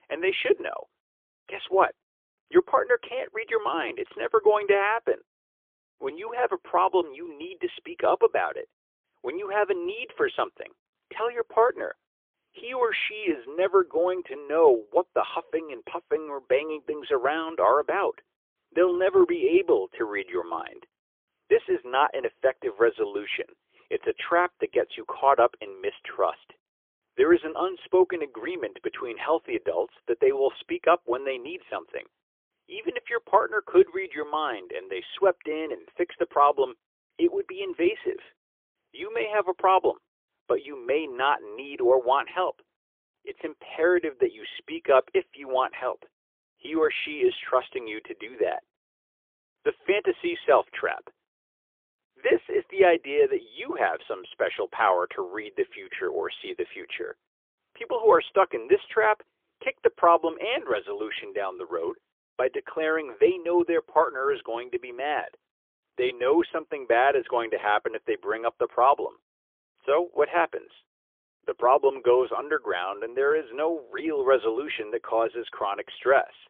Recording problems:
phone-call audio; poor line; nothing above 3.5 kHz

